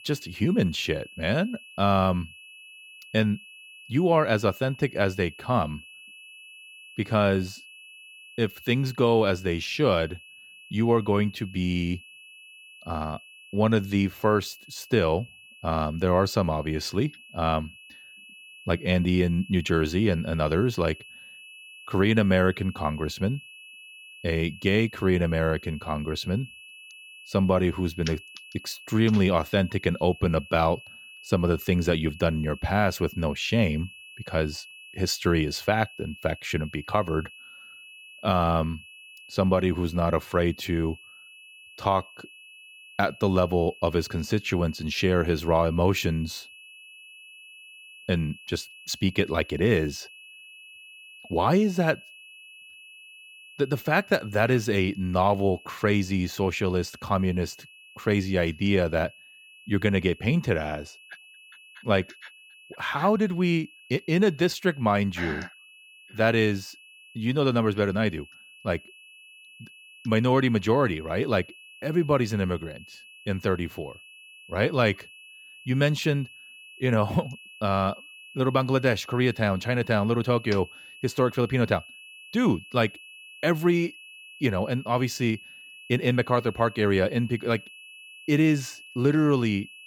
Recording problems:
high-pitched whine; noticeable; throughout; 2.5 kHz, 20 dB below the speech

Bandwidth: 17 kHz